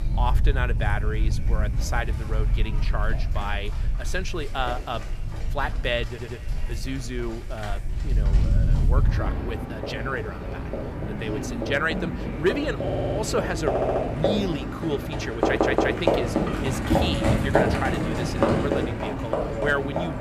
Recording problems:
echo of what is said; faint; throughout; 250 ms later, 20 dB below the speech
animal sounds; very loud; throughout; 4 dB above the speech
audio stuttering; 4 times, first at 6 s

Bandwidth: 14.5 kHz